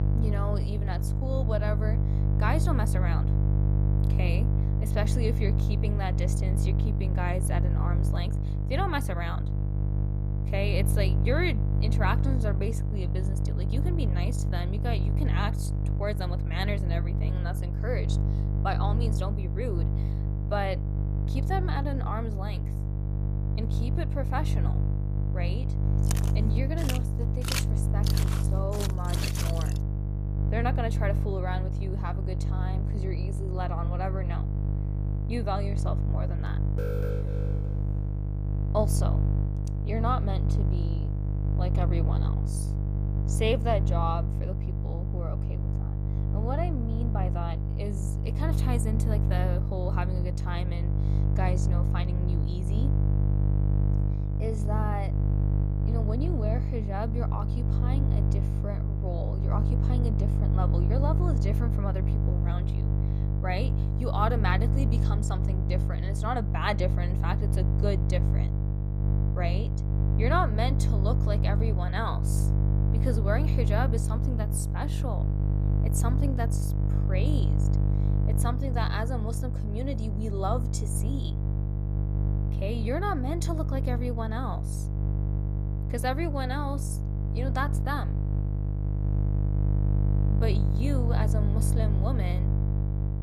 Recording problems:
electrical hum; loud; throughout; 50 Hz, 6 dB below the speech
footsteps; loud; from 26 to 30 s; peak 3 dB above the speech
alarm; noticeable; from 37 to 38 s; peak 1 dB below the speech

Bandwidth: 14.5 kHz